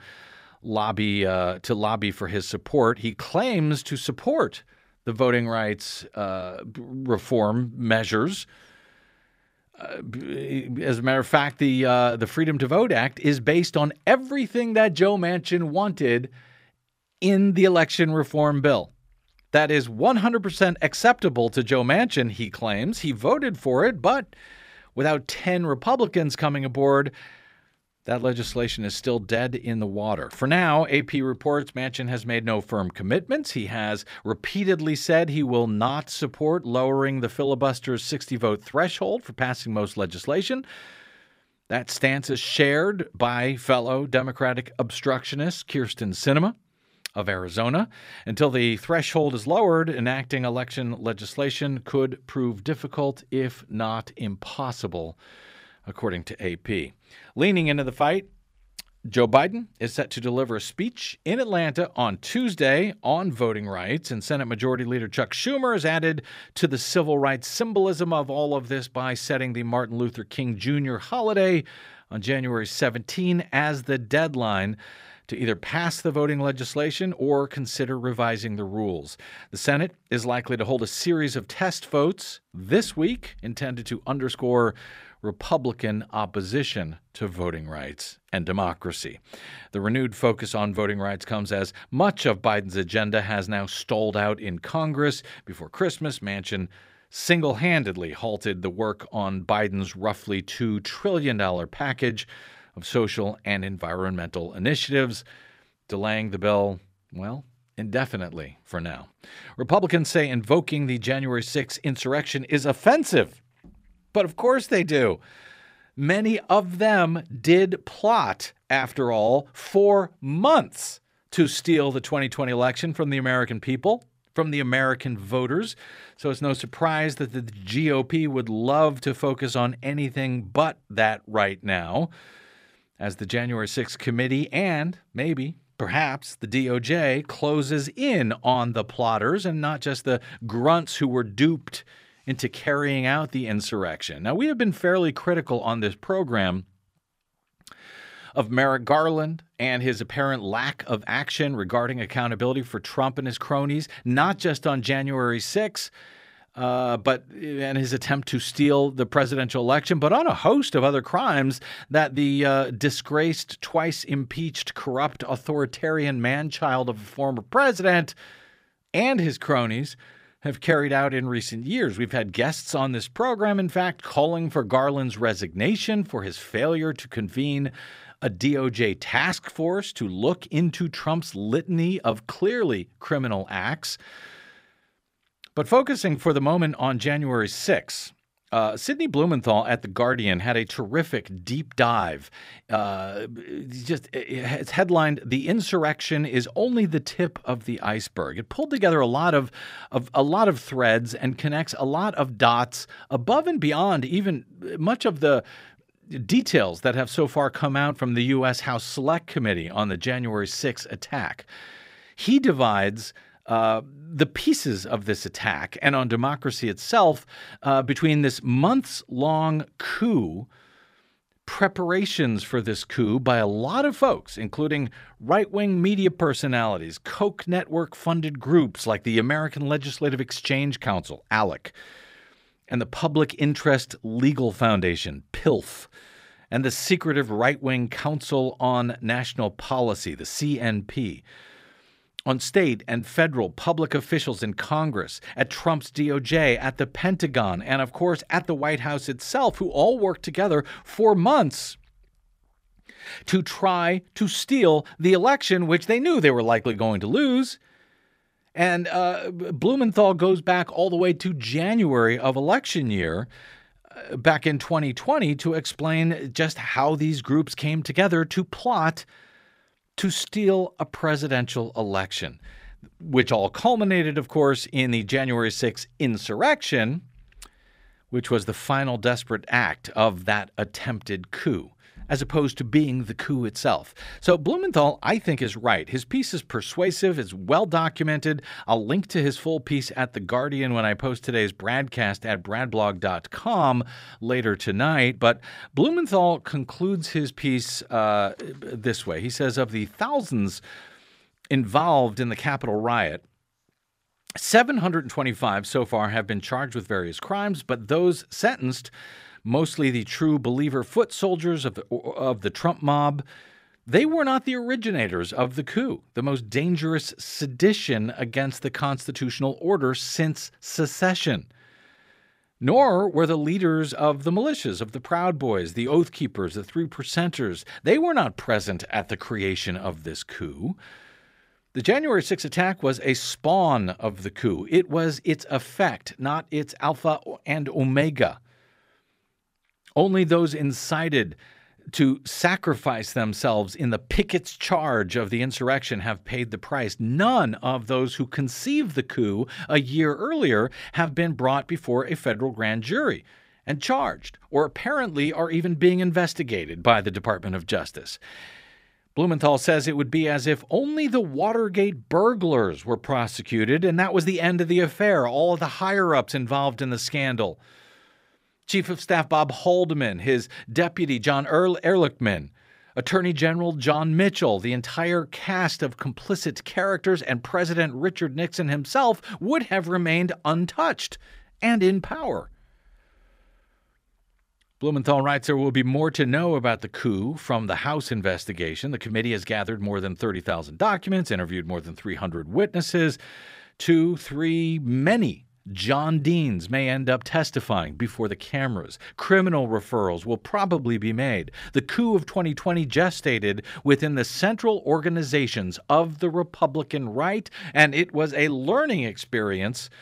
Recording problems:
none

